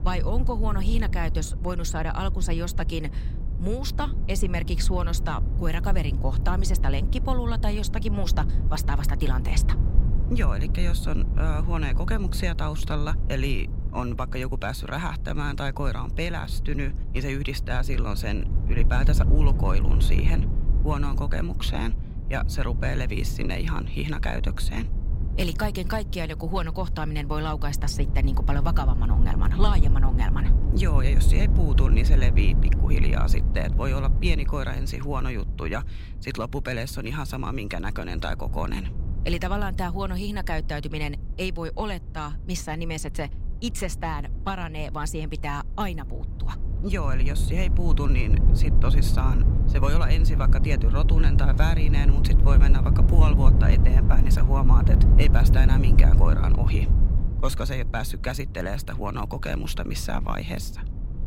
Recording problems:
low rumble; loud; throughout; 8 dB below the speech

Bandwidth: 16 kHz